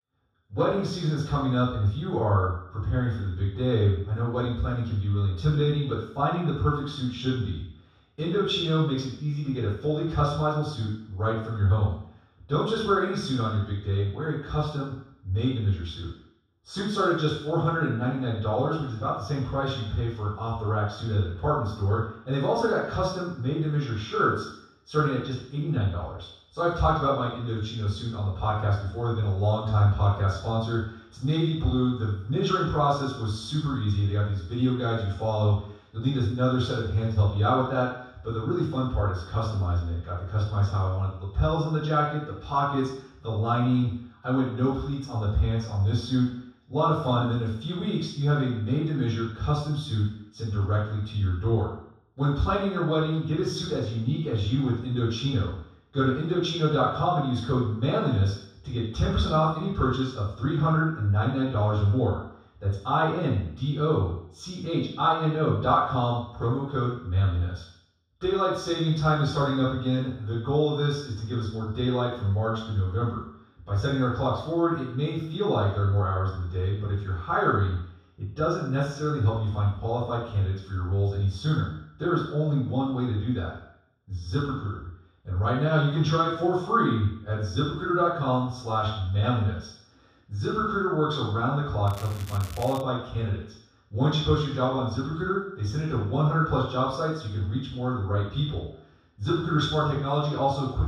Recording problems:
room echo; strong; dies away in 0.7 s
off-mic speech; far
crackling; noticeable; at 1:32; 20 dB below the speech

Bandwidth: 15 kHz